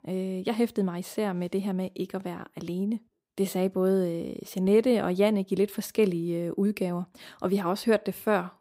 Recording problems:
none

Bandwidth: 15.5 kHz